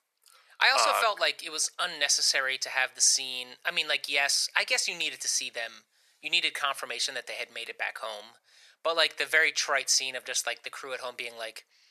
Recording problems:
thin; very; fading below 550 Hz

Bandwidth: 14 kHz